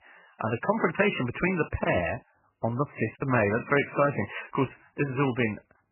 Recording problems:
garbled, watery; badly; nothing above 3 kHz
choppy; occasionally; from 2 to 3 s; 4% of the speech affected

